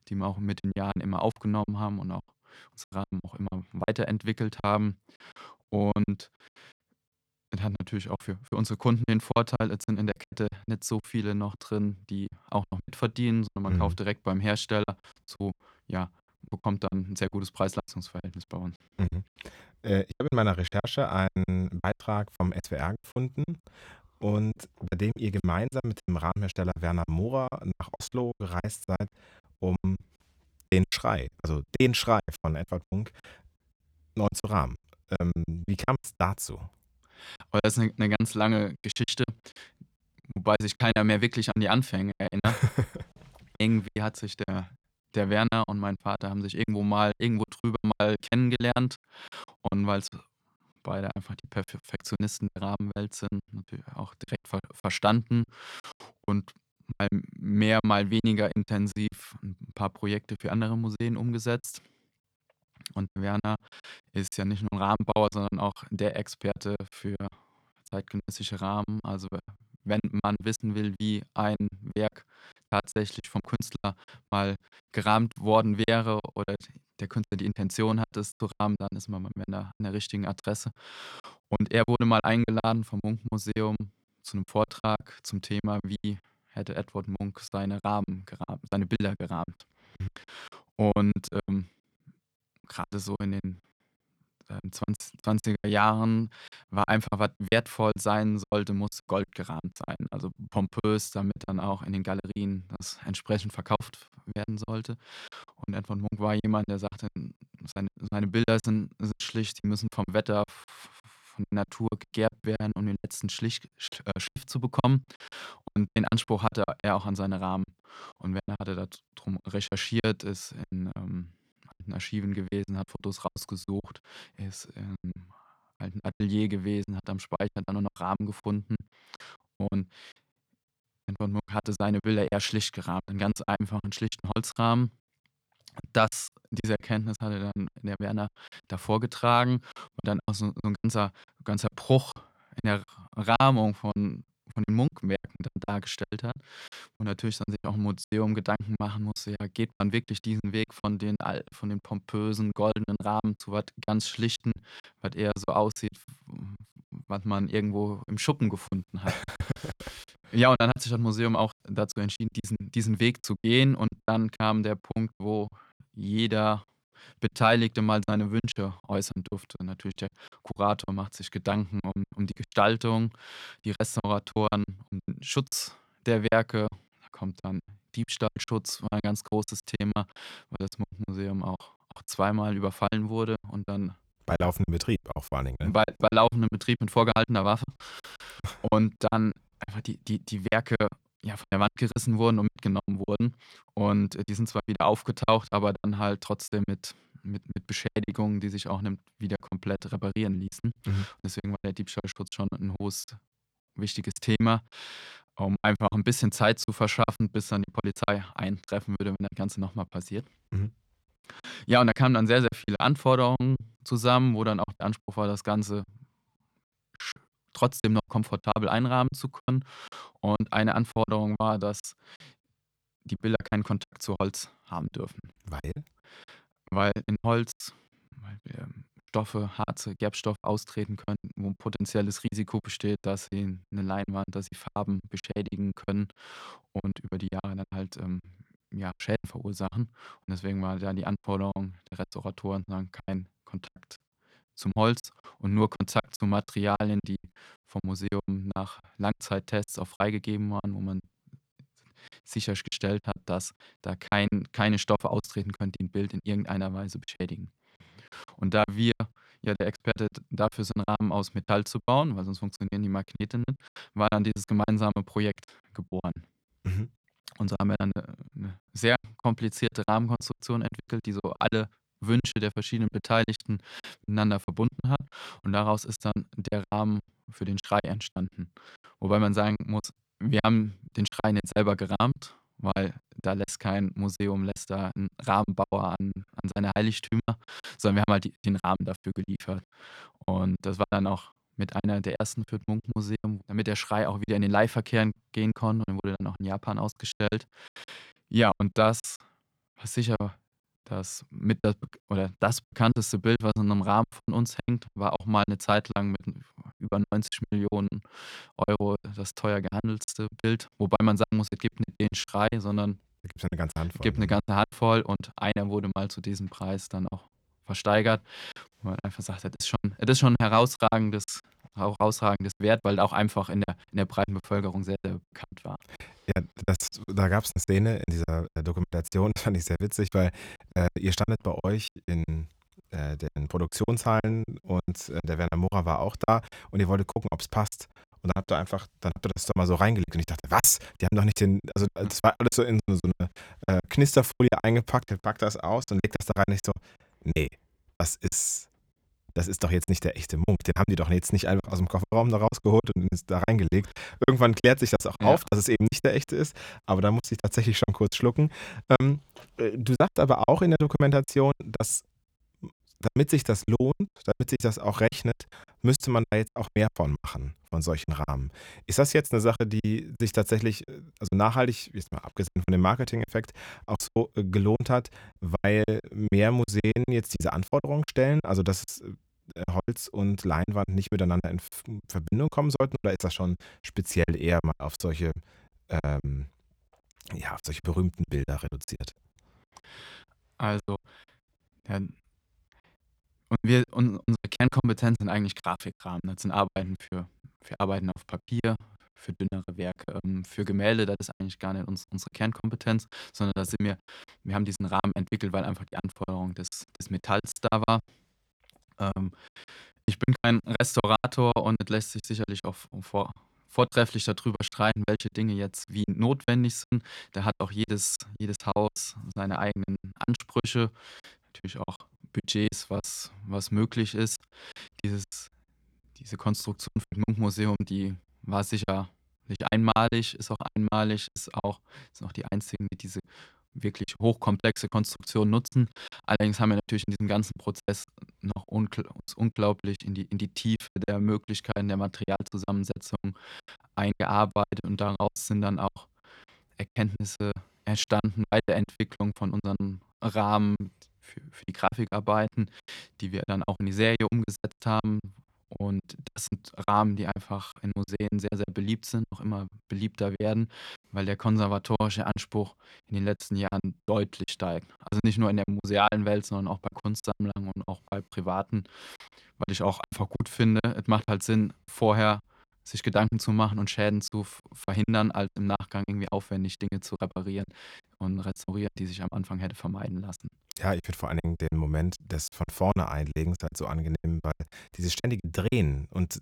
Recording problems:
choppy; very; 16% of the speech affected

